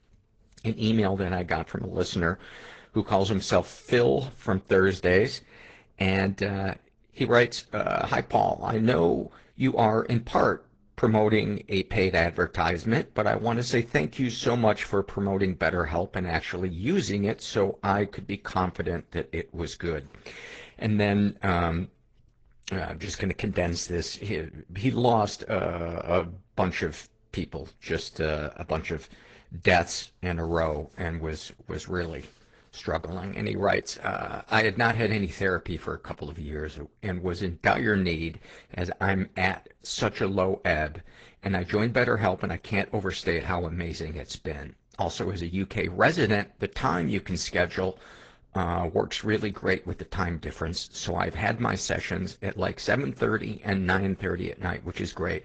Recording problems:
high frequencies cut off; noticeable; nothing above 7.5 kHz
garbled, watery; slightly

